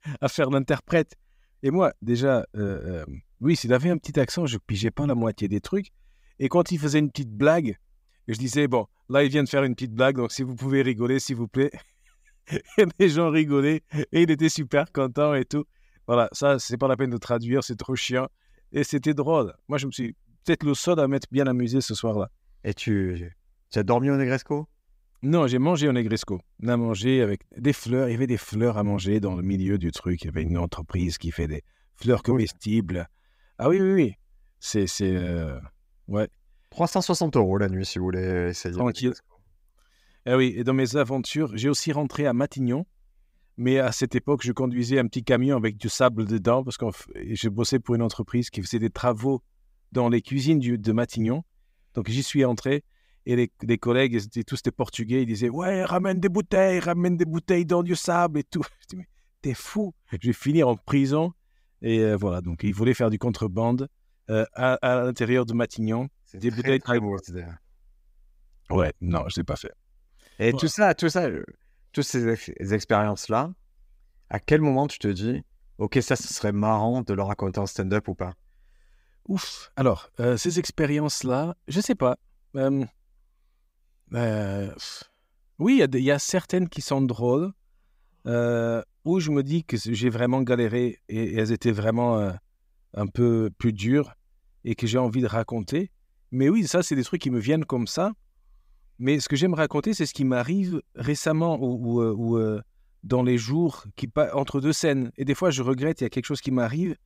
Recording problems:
none

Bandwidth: 15.5 kHz